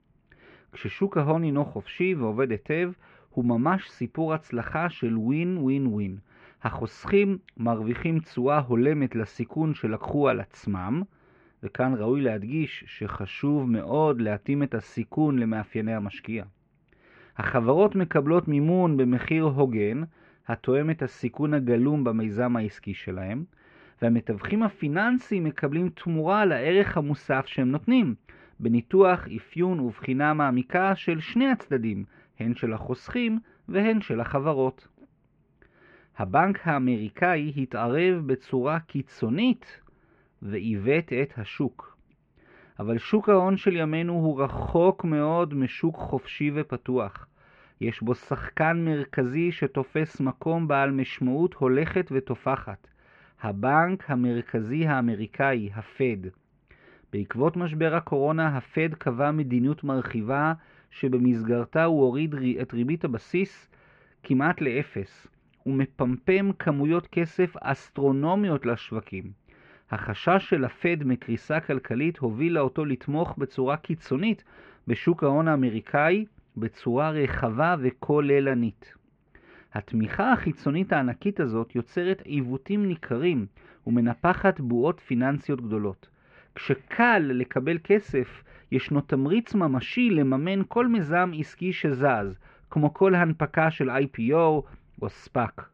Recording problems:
muffled; very; fading above 2.5 kHz

